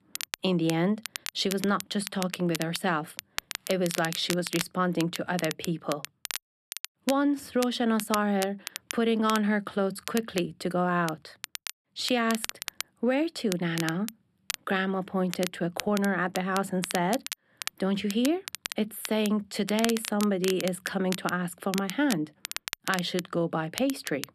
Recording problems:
crackle, like an old record; loud; 9 dB below the speech

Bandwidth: 13.5 kHz